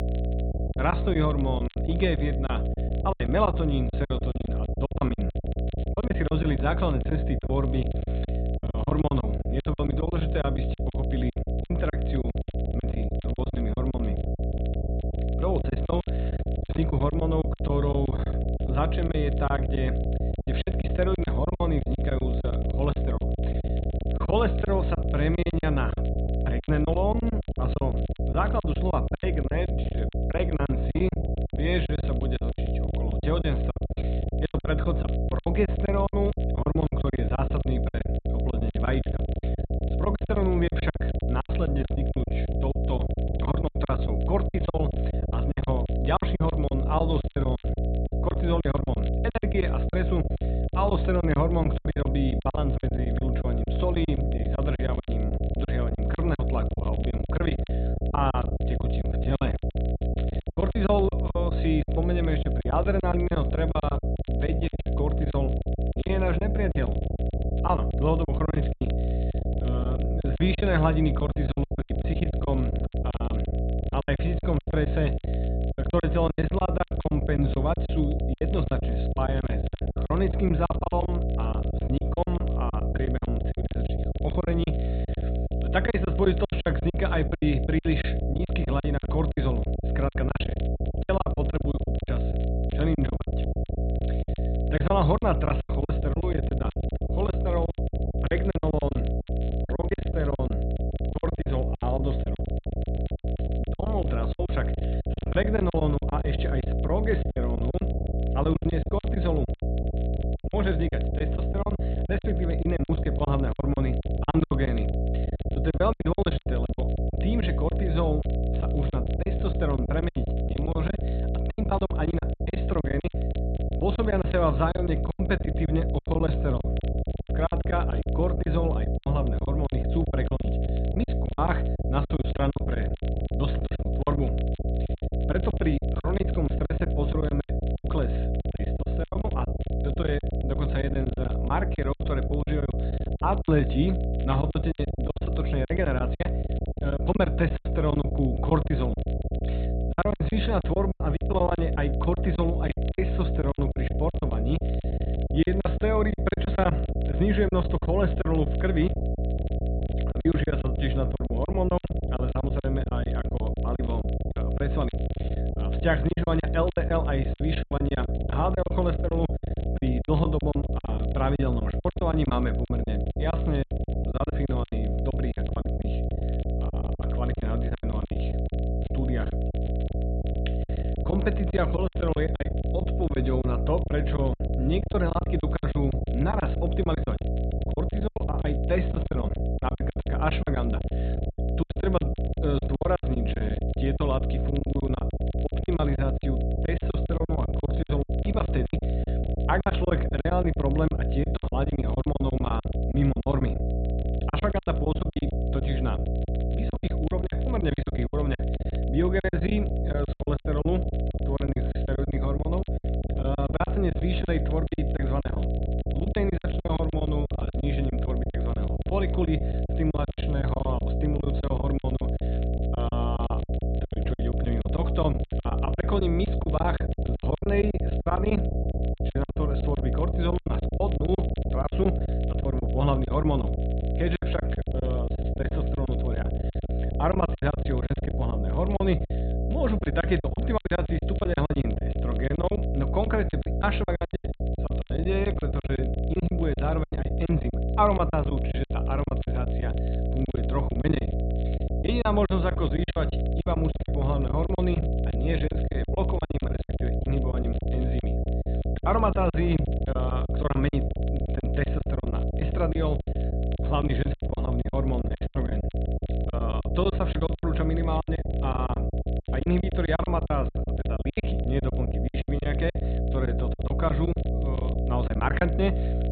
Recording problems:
high frequencies cut off; severe; nothing above 4 kHz
electrical hum; loud; throughout; 60 Hz, 6 dB below the speech
crackle, like an old record; faint; 25 dB below the speech
choppy; very; 18% of the speech affected

